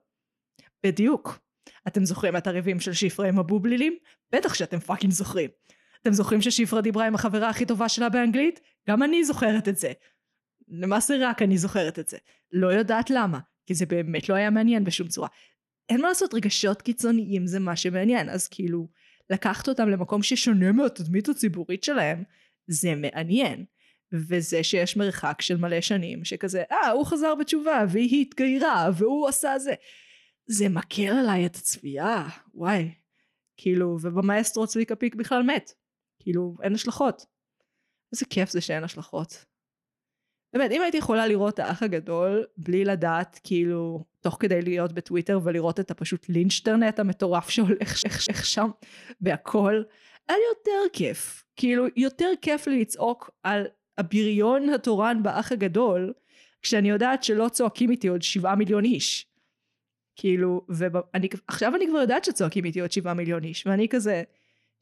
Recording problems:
audio stuttering; at 48 s

